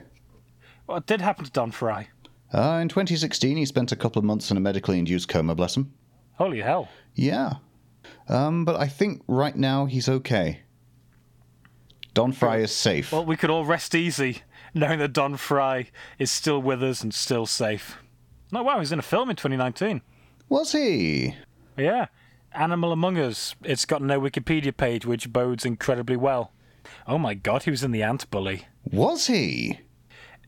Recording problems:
squashed, flat; somewhat

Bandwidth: 17.5 kHz